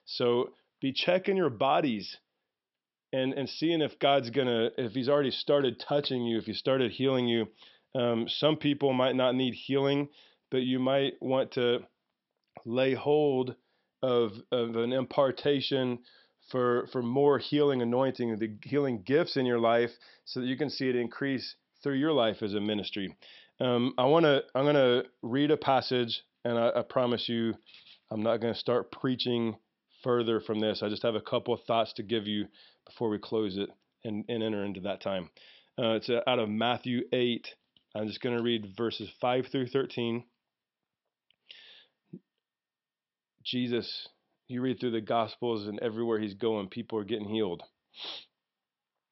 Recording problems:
high frequencies cut off; noticeable; nothing above 5.5 kHz

